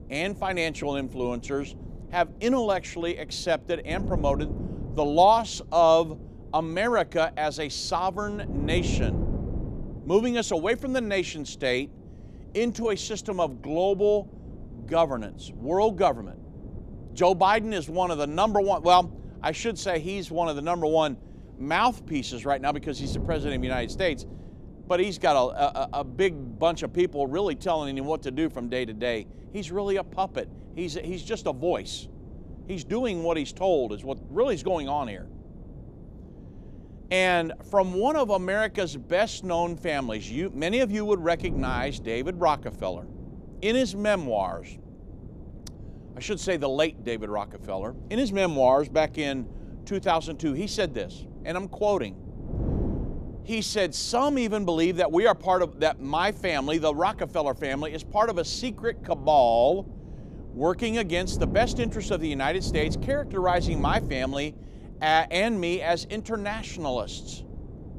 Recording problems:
wind noise on the microphone; occasional gusts; 20 dB below the speech

